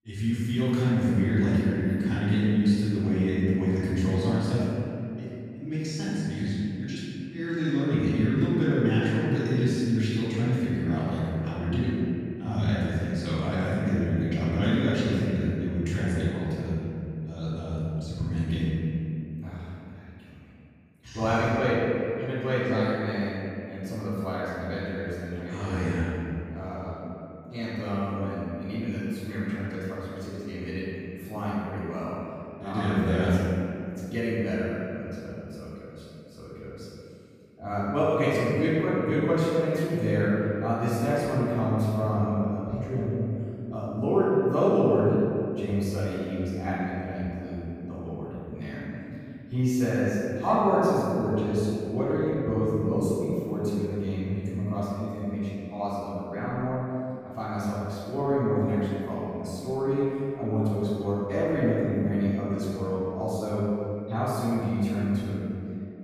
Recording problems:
room echo; strong; dies away in 2.5 s
off-mic speech; far

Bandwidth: 15 kHz